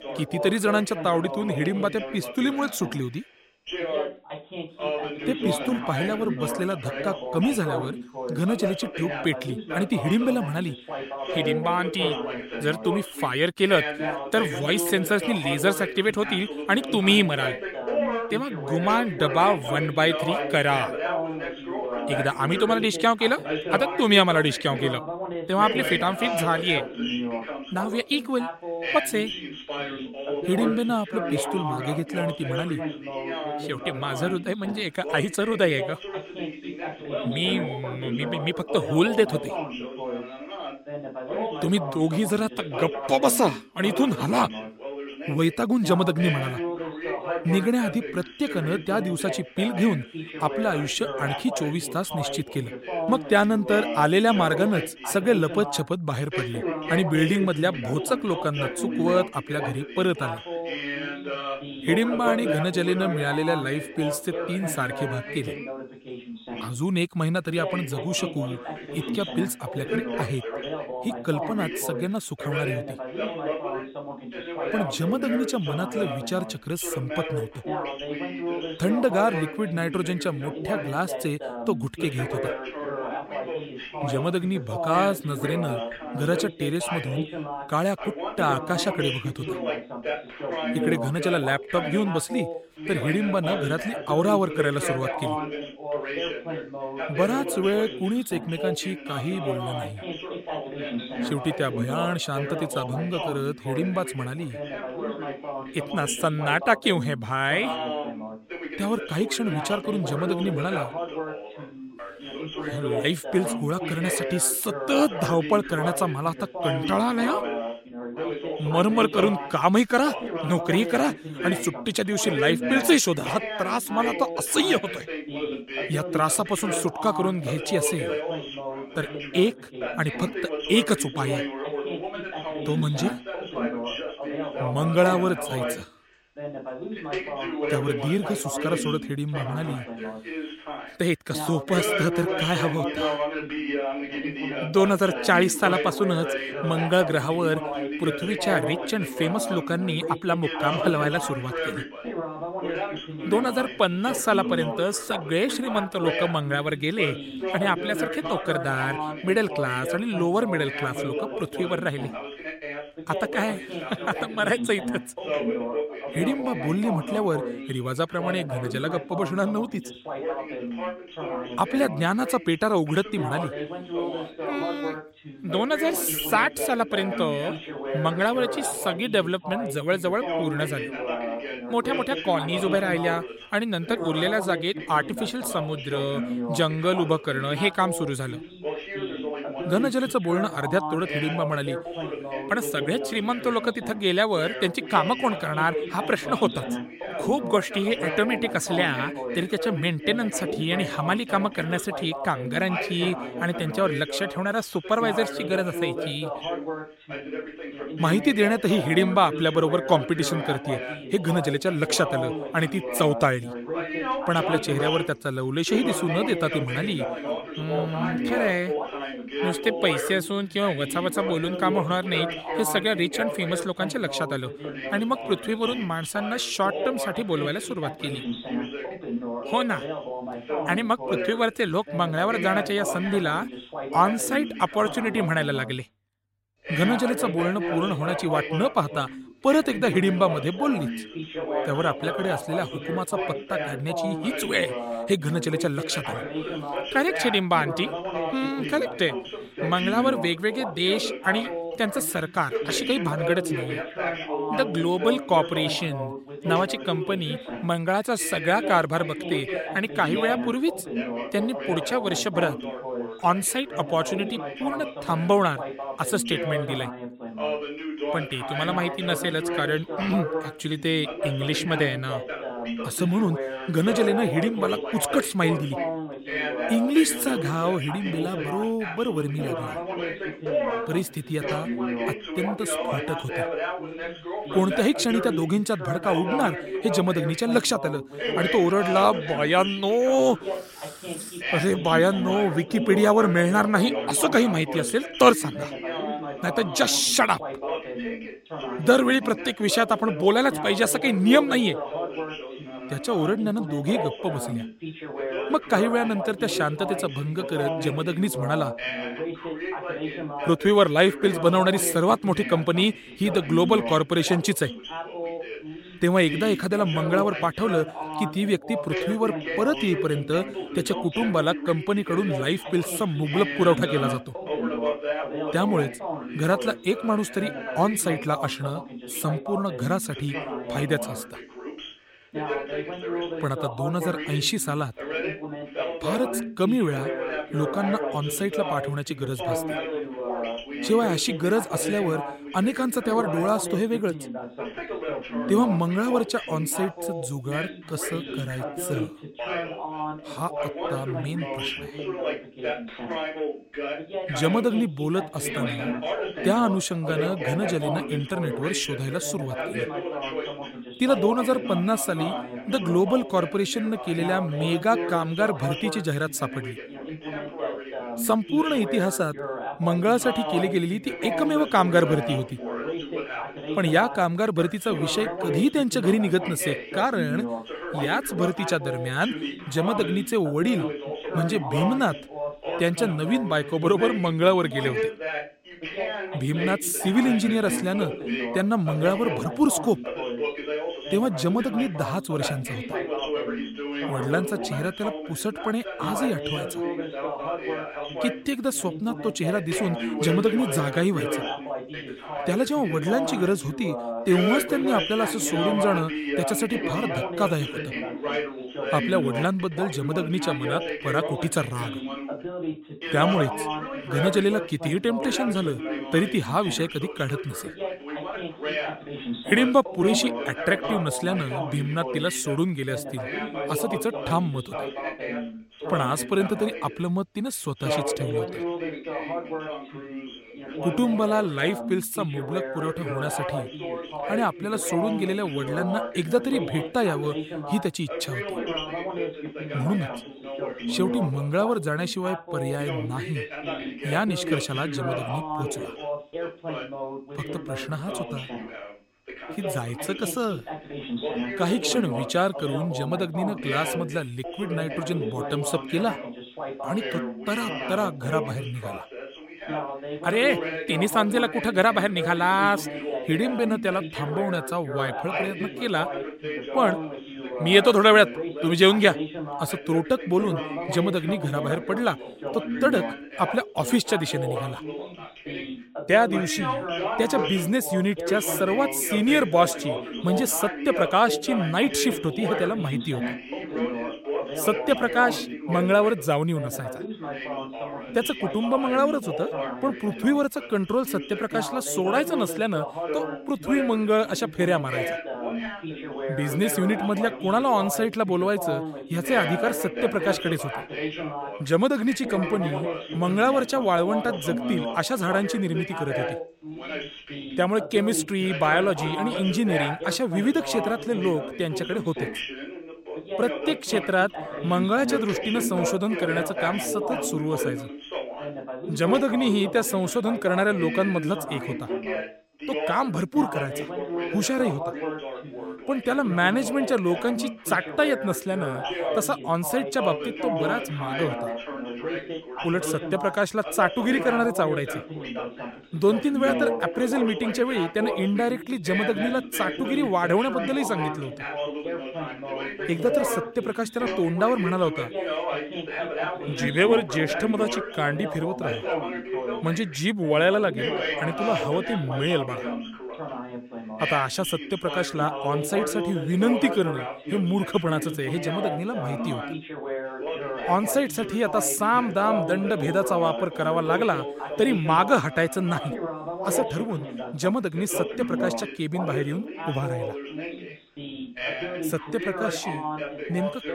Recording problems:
background chatter; loud; throughout; 2 voices, 6 dB below the speech

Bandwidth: 16 kHz